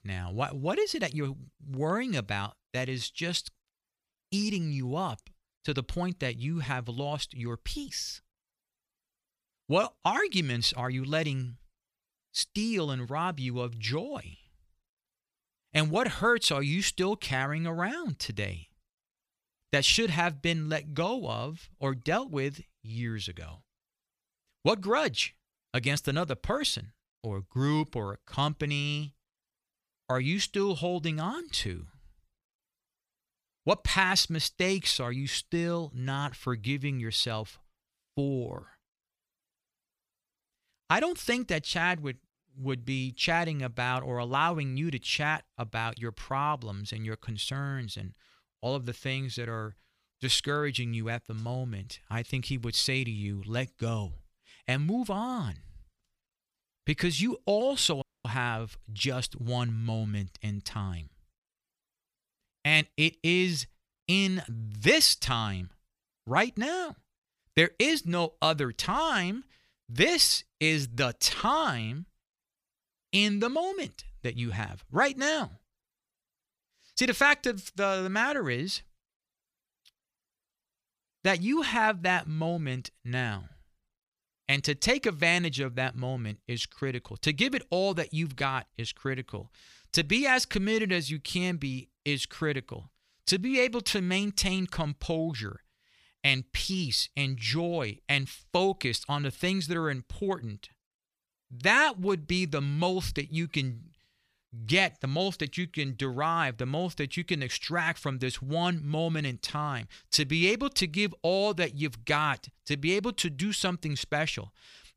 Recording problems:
audio cutting out; at 58 s

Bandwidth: 15 kHz